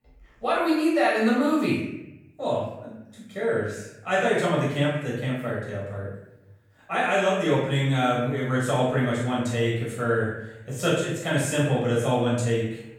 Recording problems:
off-mic speech; far
room echo; noticeable; dies away in 0.8 s

